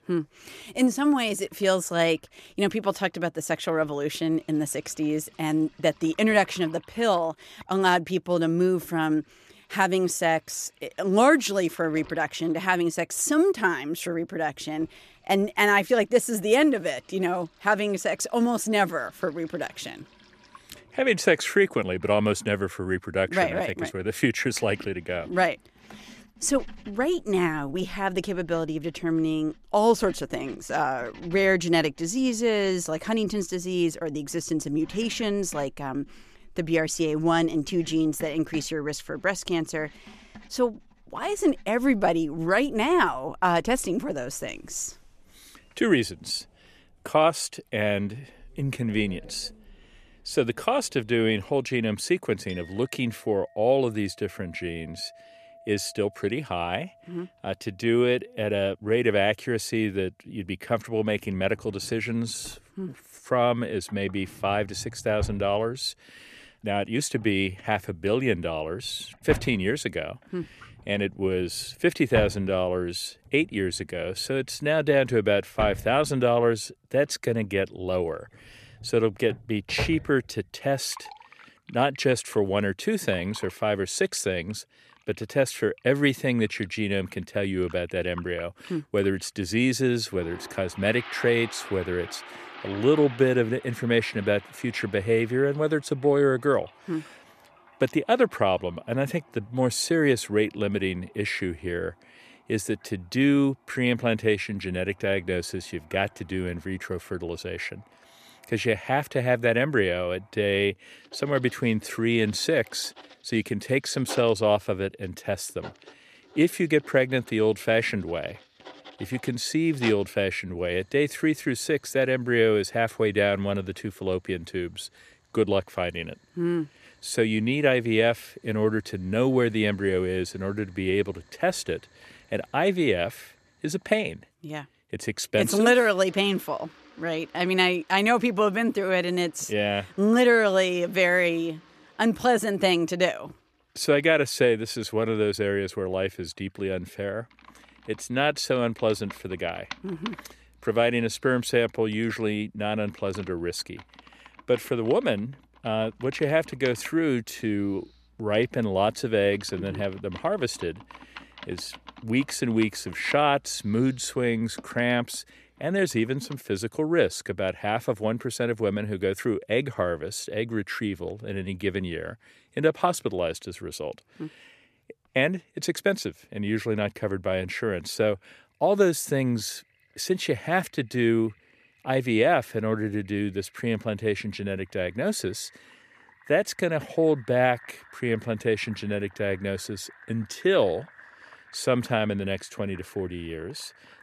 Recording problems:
household noises; faint; throughout; 20 dB below the speech

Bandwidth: 14.5 kHz